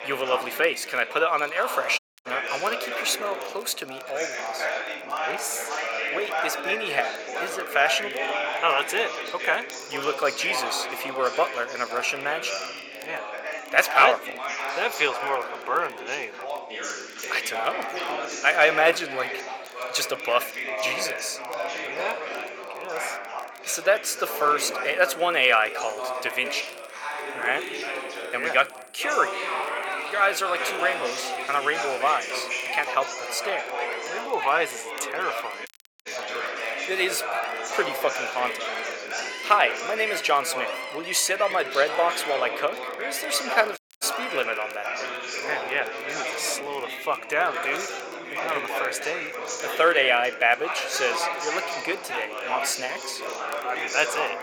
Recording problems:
thin; very; fading below 650 Hz
background chatter; loud; throughout; 4 voices, 5 dB below the speech
animal sounds; noticeable; throughout; 15 dB below the speech
crackle, like an old record; faint; 25 dB below the speech
audio cutting out; at 2 s, at 36 s and at 44 s

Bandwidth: 17.5 kHz